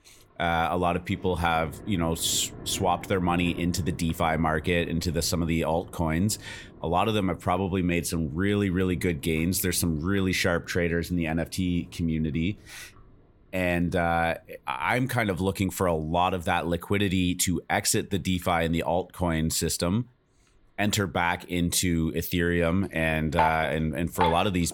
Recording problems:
rain or running water; noticeable; throughout; 10 dB below the speech

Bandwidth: 17 kHz